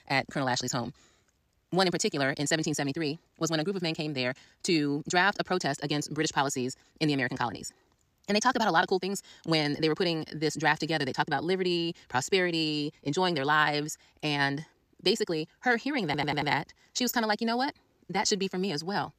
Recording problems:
wrong speed, natural pitch; too fast; 1.7 times normal speed
audio stuttering; at 16 s

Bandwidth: 14.5 kHz